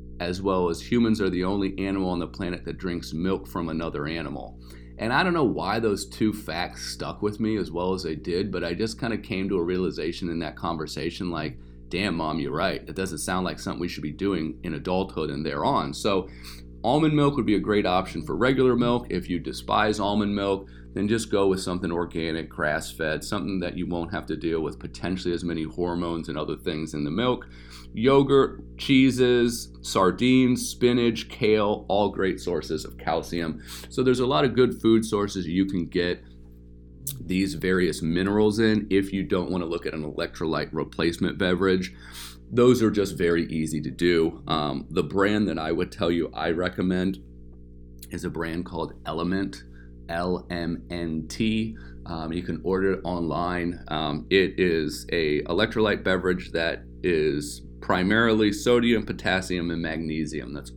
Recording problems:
electrical hum; faint; throughout; 60 Hz, 30 dB below the speech

